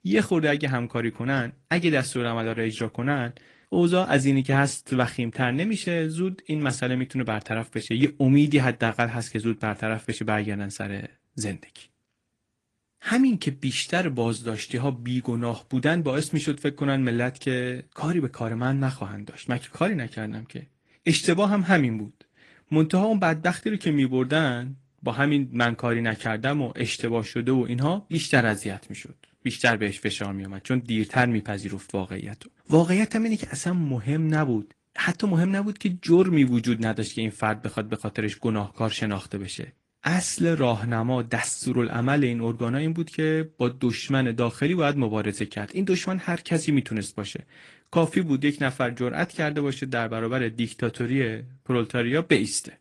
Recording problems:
garbled, watery; slightly; nothing above 10 kHz

